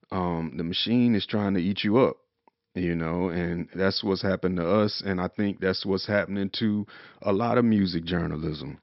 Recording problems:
high frequencies cut off; noticeable; nothing above 5.5 kHz

